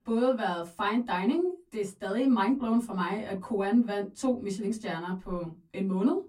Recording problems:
off-mic speech; far
room echo; very slight; dies away in 0.2 s

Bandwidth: 16 kHz